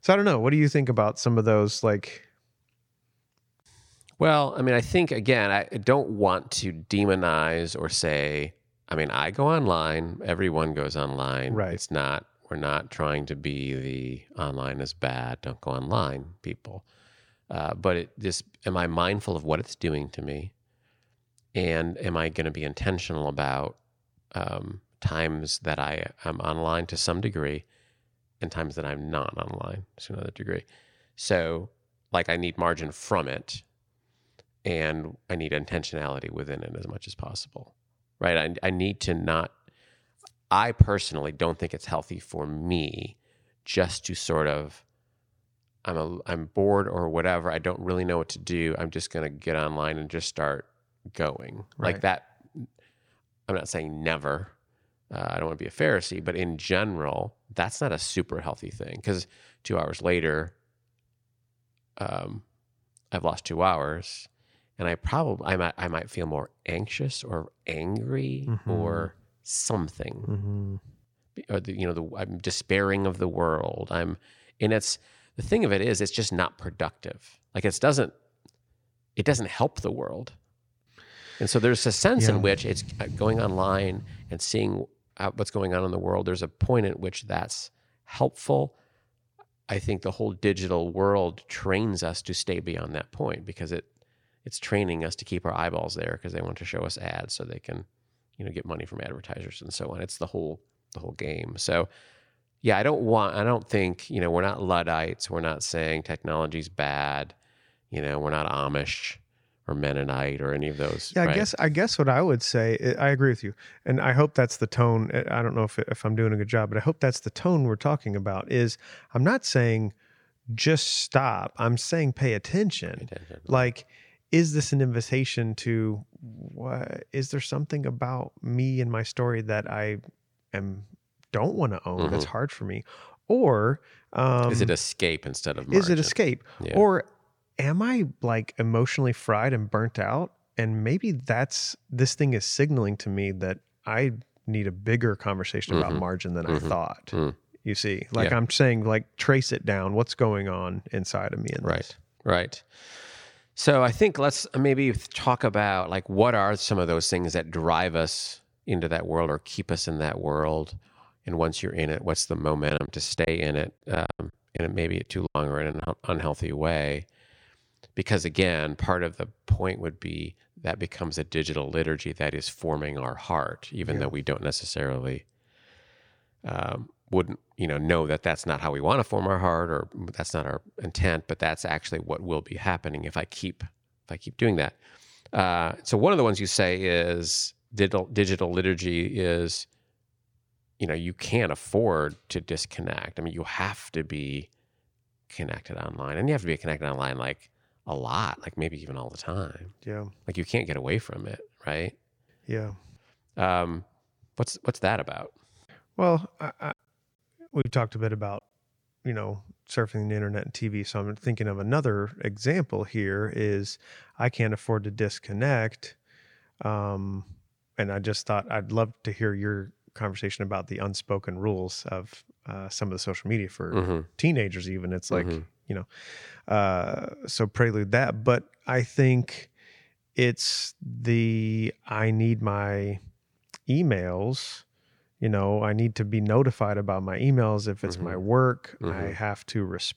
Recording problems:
choppy; very; from 2:43 to 2:46 and at 3:28; 10% of the speech affected

